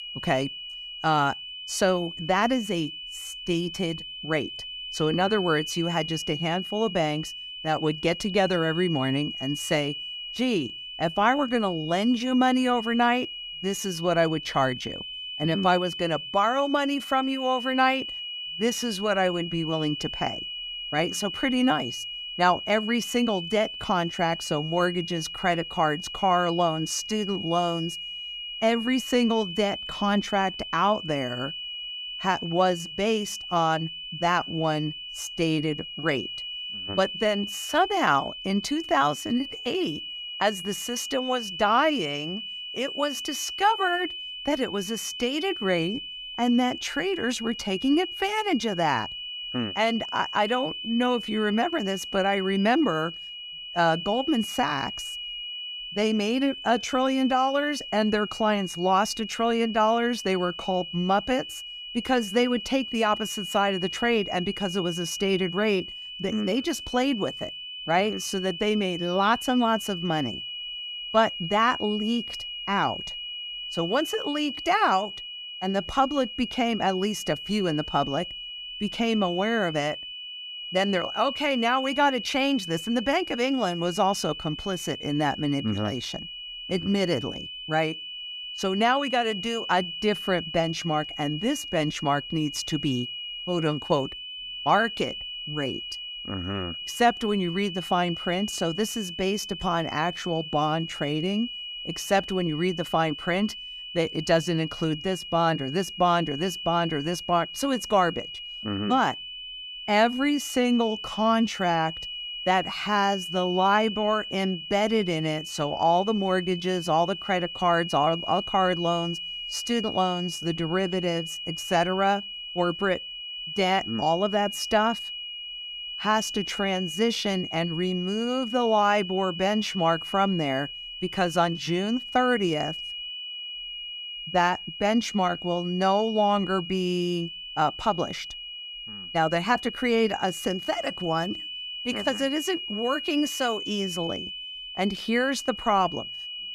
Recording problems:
high-pitched whine; loud; throughout; 3 kHz, 8 dB below the speech

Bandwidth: 14.5 kHz